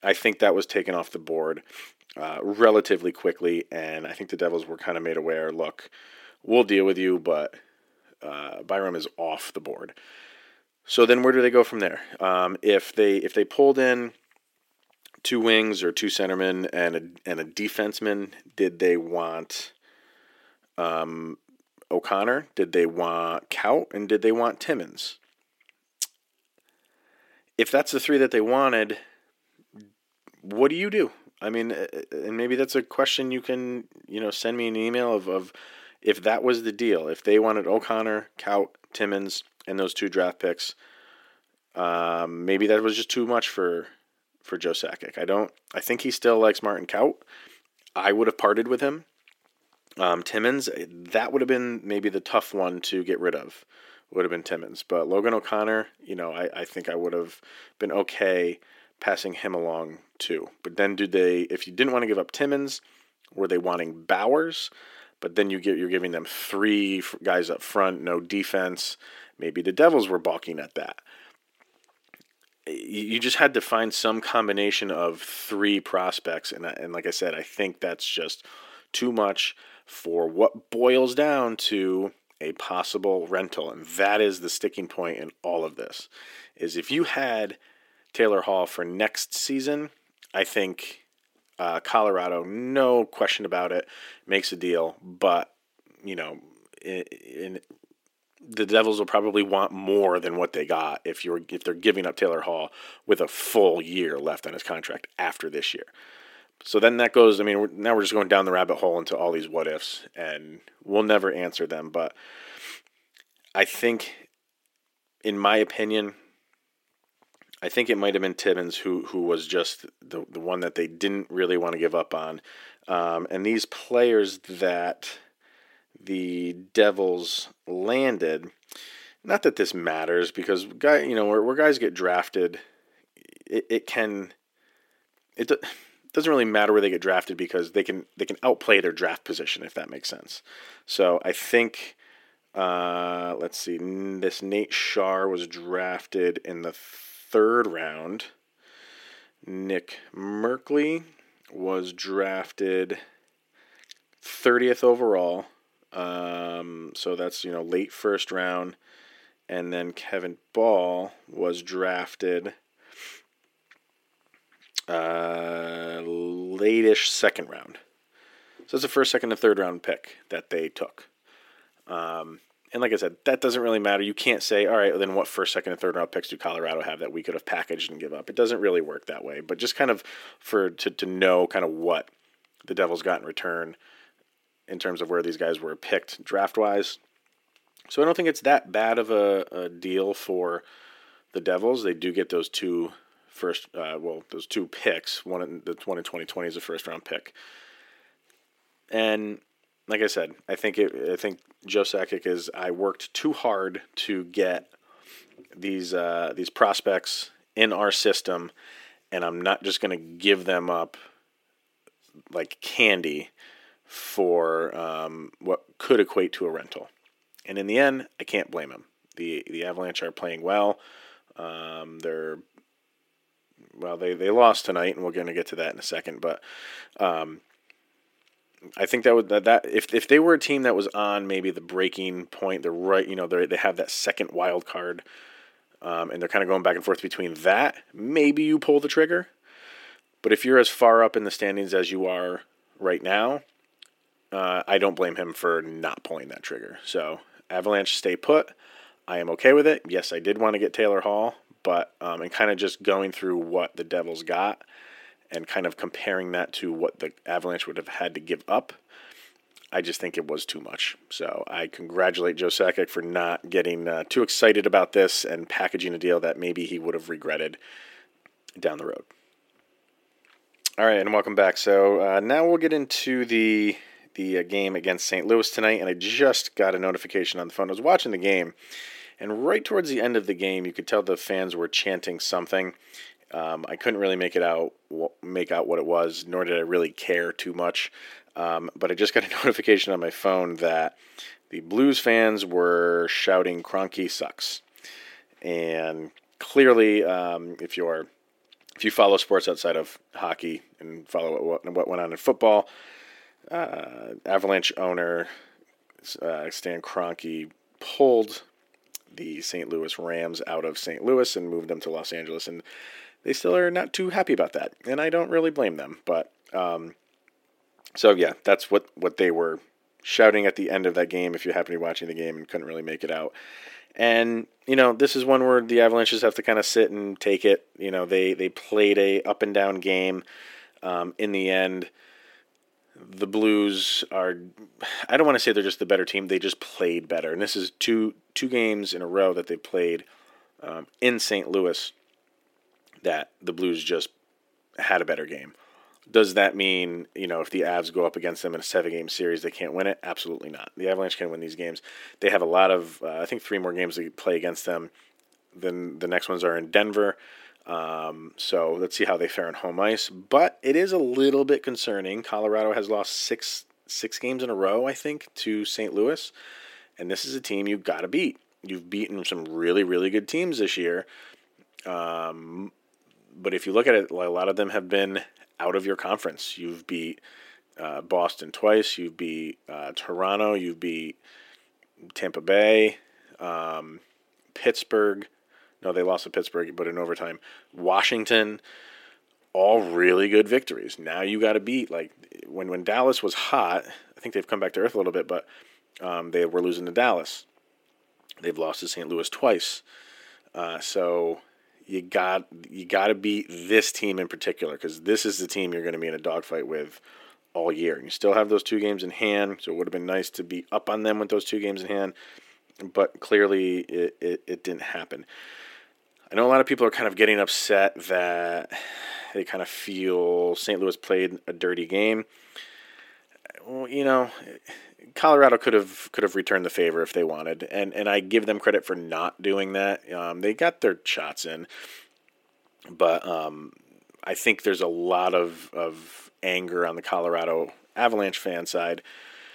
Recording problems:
thin; somewhat; fading below 300 Hz

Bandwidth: 16.5 kHz